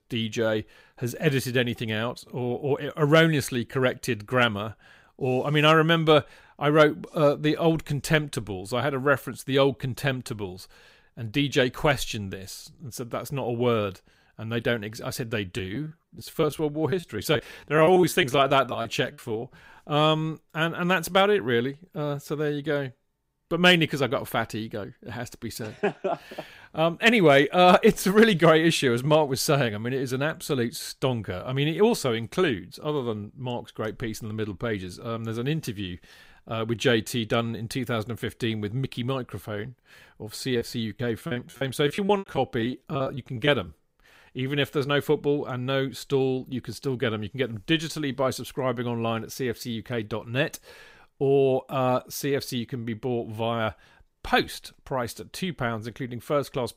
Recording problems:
choppy; very; from 16 to 19 s and from 41 to 43 s; 19% of the speech affected

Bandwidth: 15.5 kHz